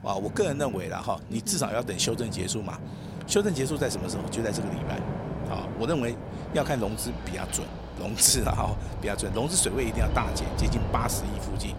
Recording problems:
train or aircraft noise; loud; throughout; 6 dB below the speech

